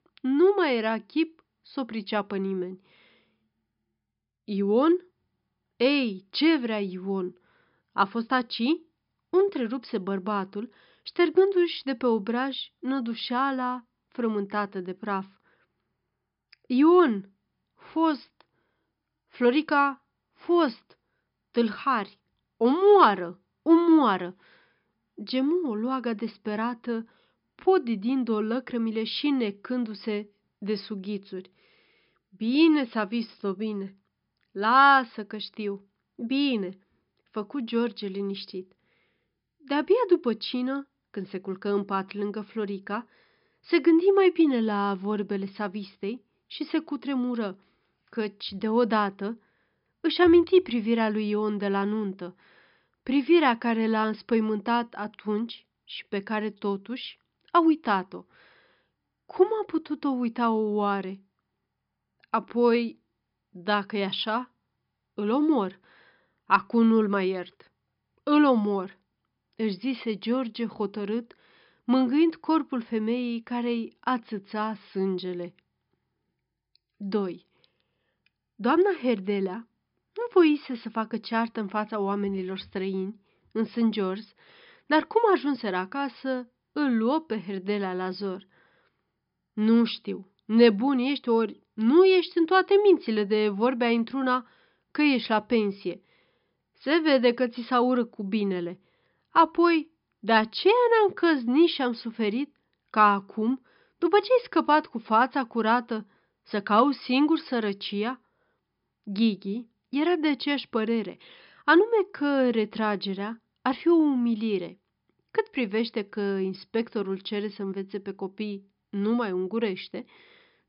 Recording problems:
high frequencies cut off; noticeable; nothing above 5.5 kHz

